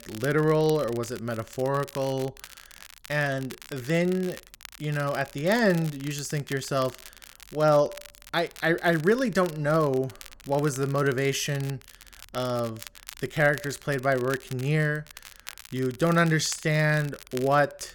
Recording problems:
crackle, like an old record; noticeable; 20 dB below the speech

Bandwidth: 17.5 kHz